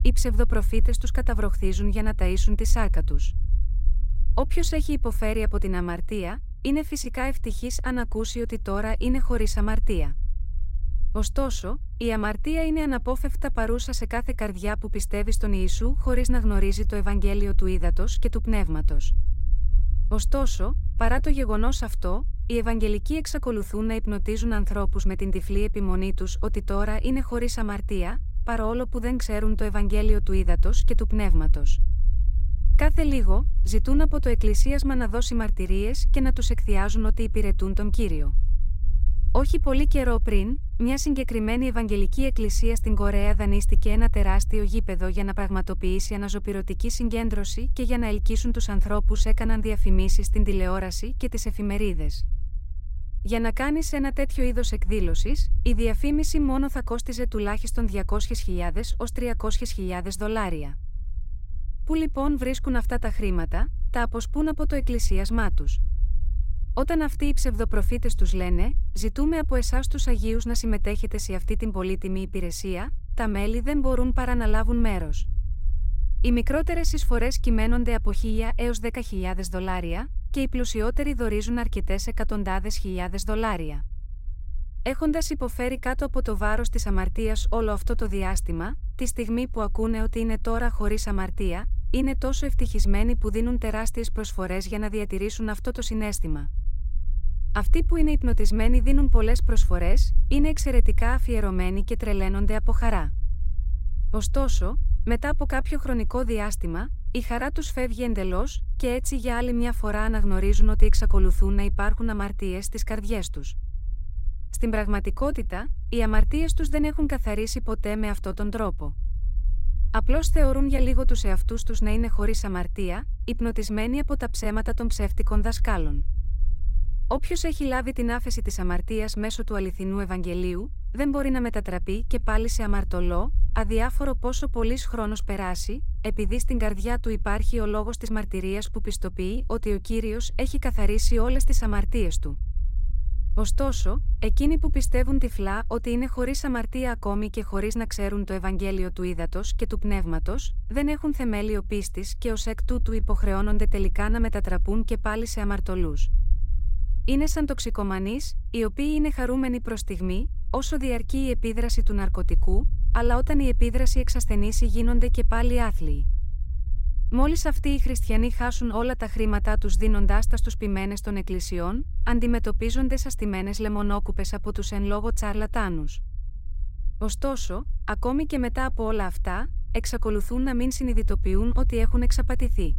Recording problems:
low rumble; faint; throughout; 20 dB below the speech

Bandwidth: 16 kHz